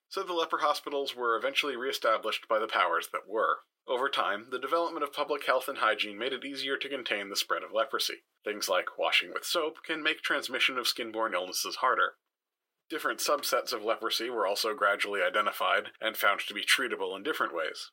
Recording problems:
thin; very; fading below 450 Hz

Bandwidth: 16 kHz